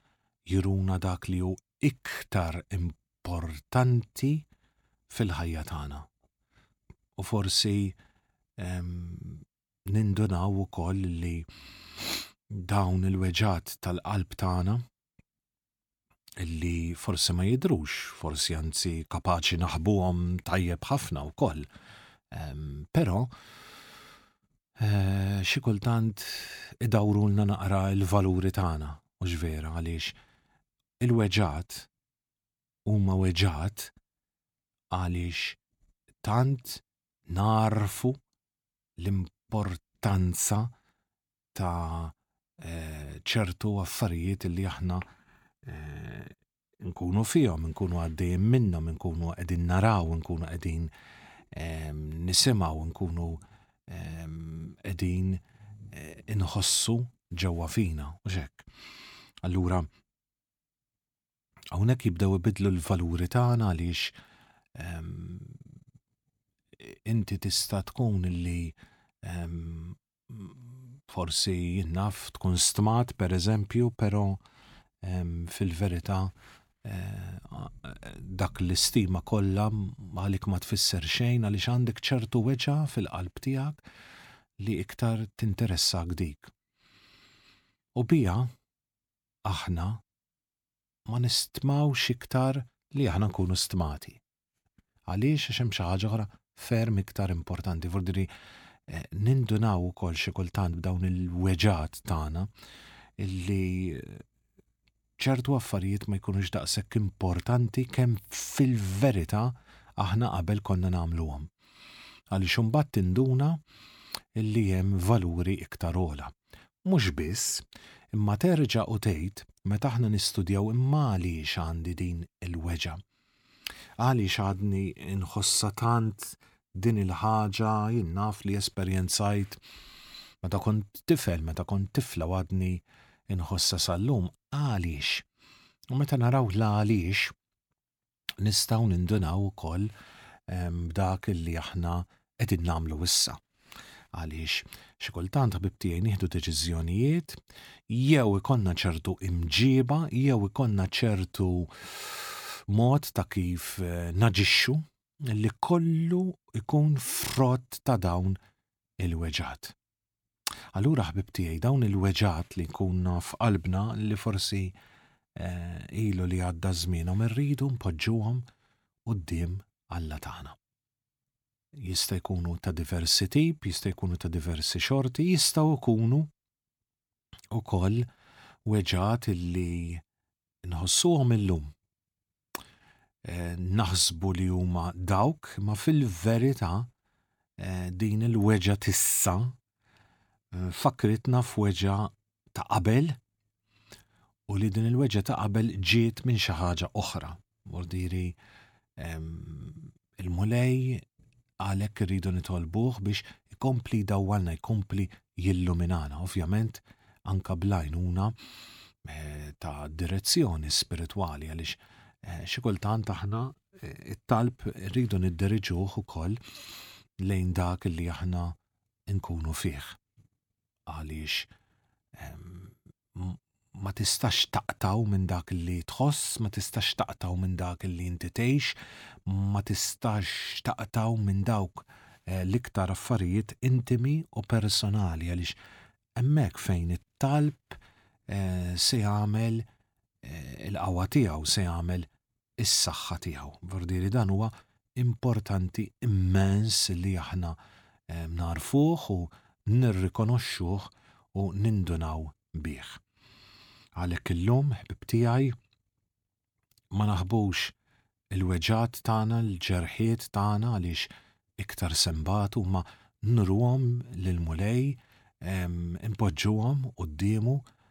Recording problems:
none

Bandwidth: 18.5 kHz